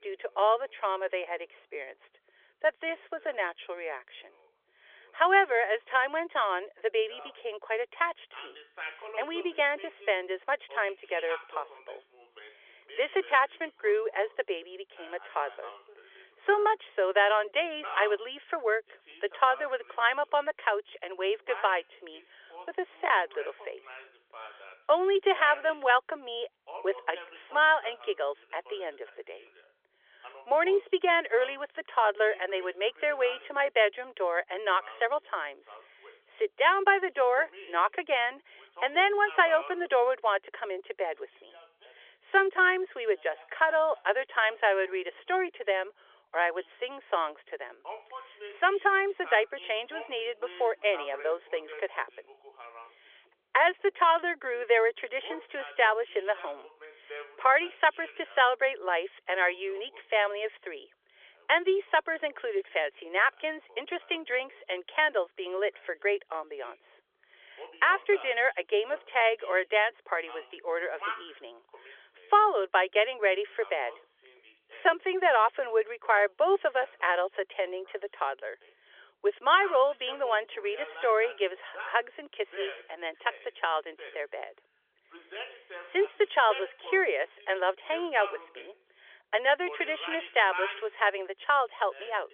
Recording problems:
phone-call audio; nothing above 3.5 kHz
voice in the background; noticeable; throughout; 15 dB below the speech

